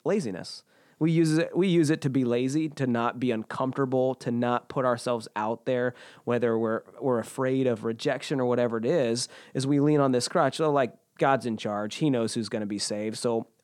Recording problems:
none

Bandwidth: 18 kHz